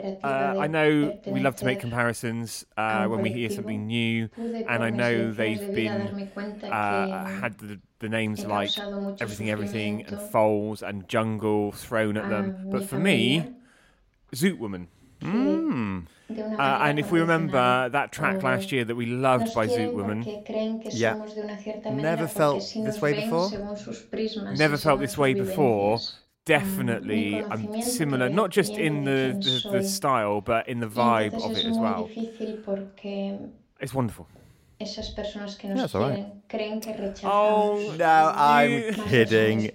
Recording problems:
voice in the background; loud; throughout; 7 dB below the speech

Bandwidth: 16 kHz